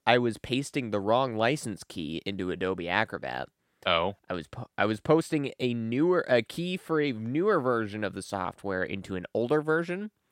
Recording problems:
none

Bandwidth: 16 kHz